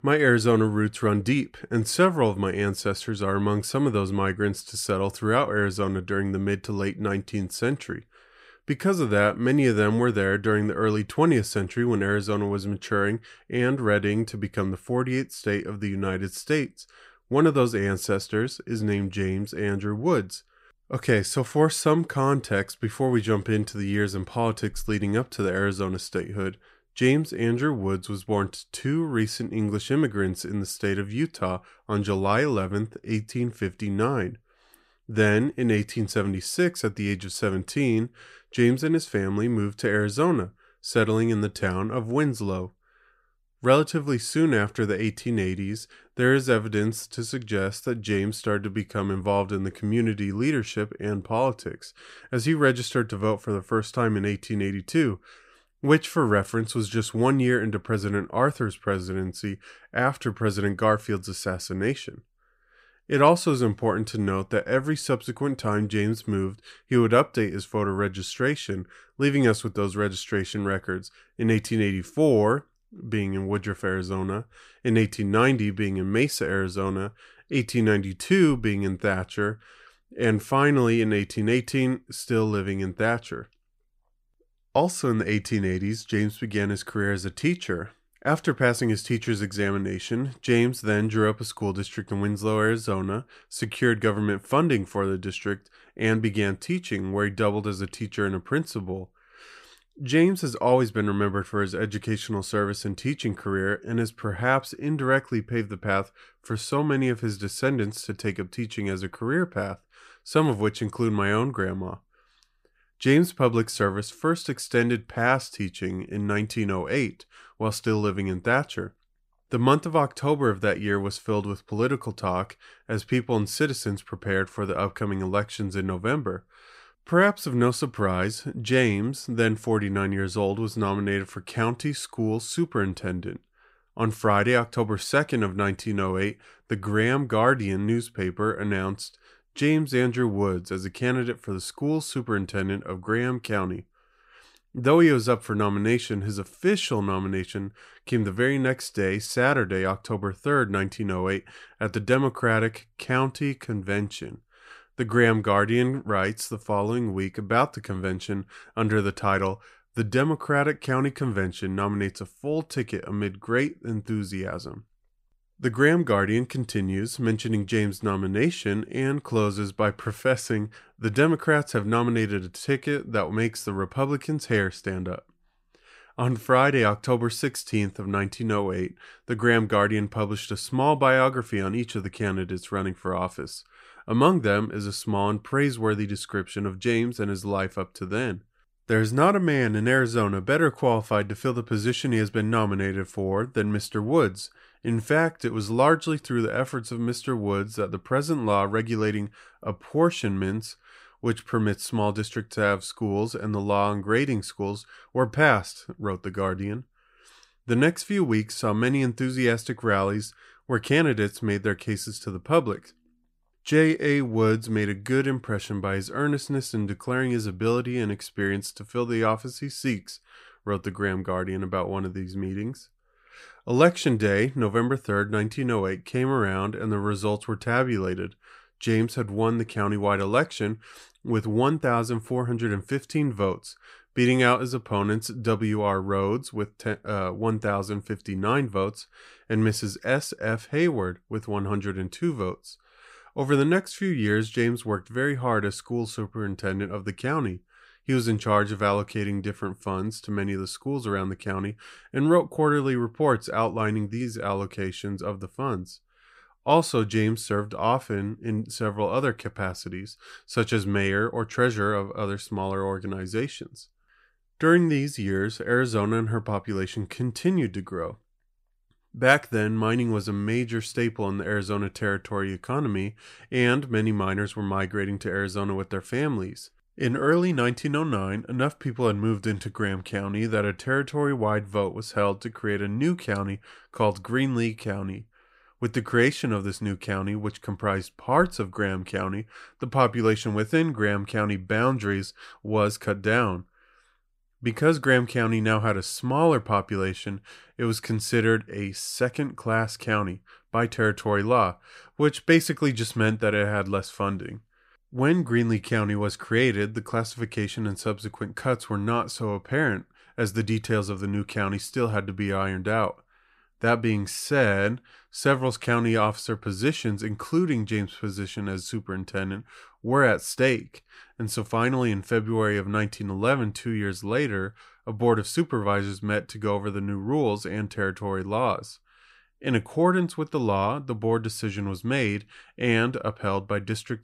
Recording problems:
none

